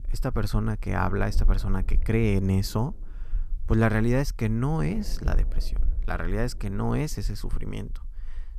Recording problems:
low rumble; faint; throughout; 20 dB below the speech

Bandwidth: 14.5 kHz